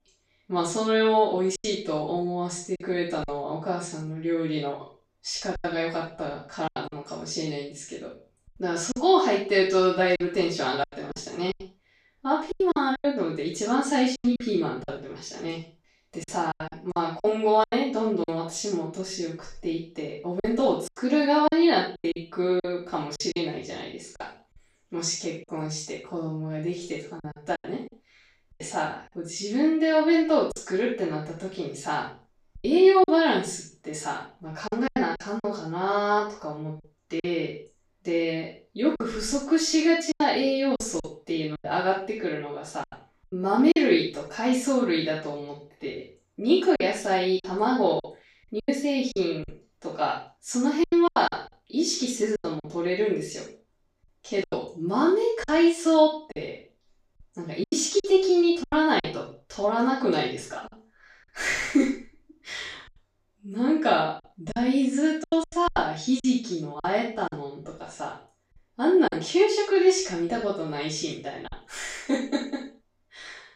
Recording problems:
off-mic speech; far
room echo; noticeable; dies away in 0.3 s
choppy; very; 7% of the speech affected

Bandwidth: 15.5 kHz